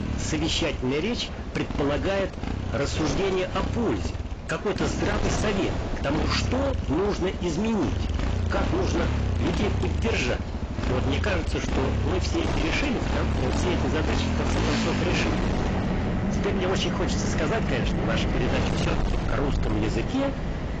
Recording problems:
distortion; heavy; 31% of the sound clipped
garbled, watery; badly; nothing above 7.5 kHz
wind noise on the microphone; heavy; 8 dB below the speech
traffic noise; loud; throughout; 1 dB below the speech

